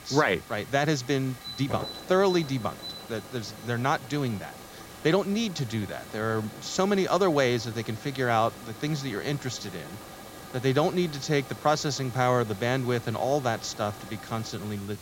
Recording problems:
high frequencies cut off; noticeable; nothing above 8 kHz
hiss; noticeable; throughout; 15 dB below the speech
alarm; faint; from 1.5 to 5 s; peak 10 dB below the speech

